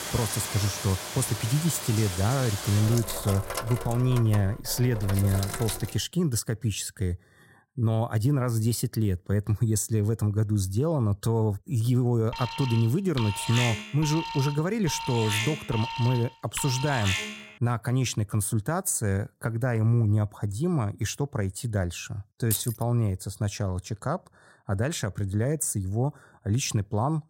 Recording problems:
household noises; loud; until 6 s; 7 dB below the speech
alarm; noticeable; from 12 to 17 s; peak 1 dB below the speech
jangling keys; noticeable; at 23 s; peak 3 dB below the speech

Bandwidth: 16 kHz